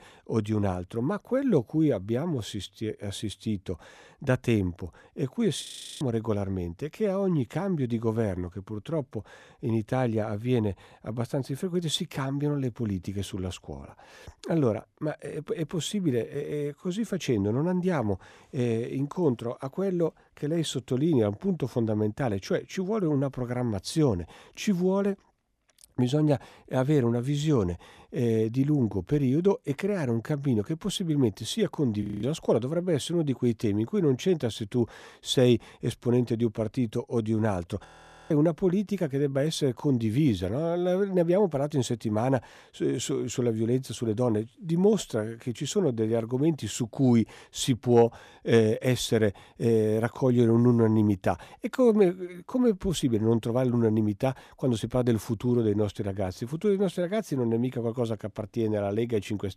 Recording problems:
audio freezing; at 5.5 s, at 32 s and at 38 s

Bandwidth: 14 kHz